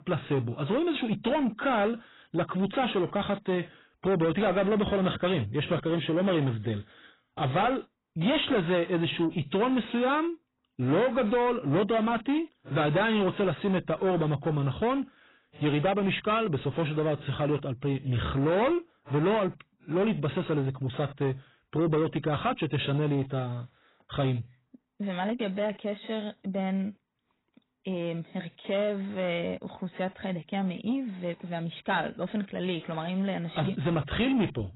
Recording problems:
garbled, watery; badly; nothing above 4 kHz
distortion; slight; 10 dB below the speech

